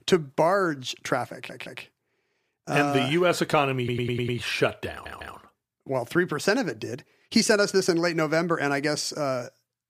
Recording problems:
audio stuttering; at 1.5 s, at 4 s and at 5 s

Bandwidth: 15 kHz